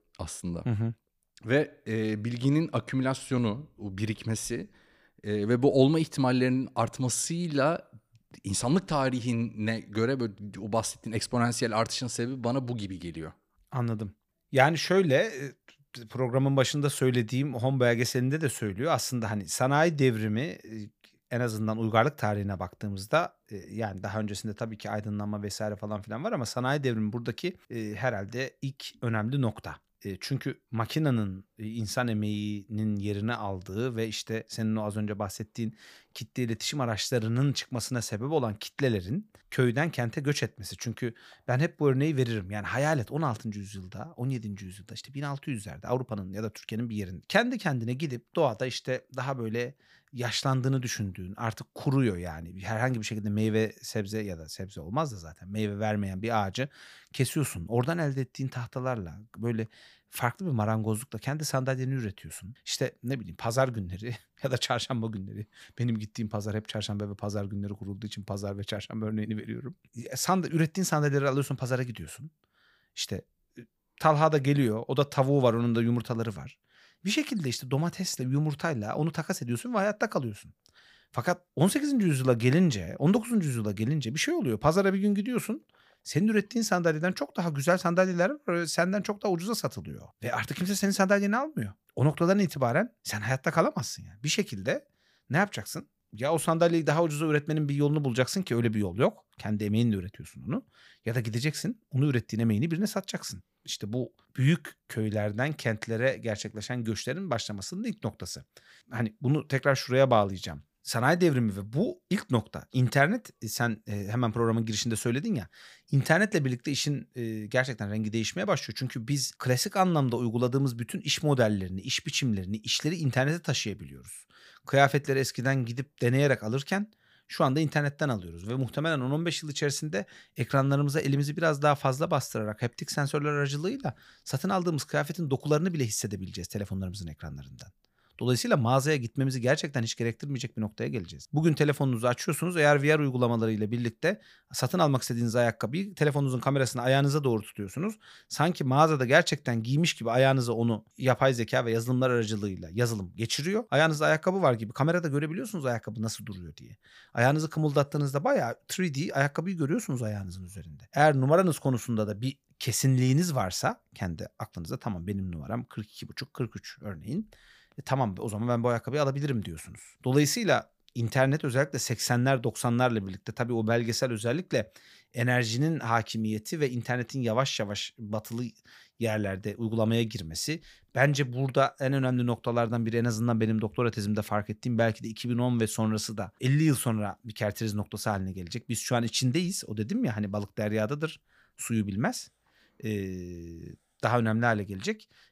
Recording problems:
none

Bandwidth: 15 kHz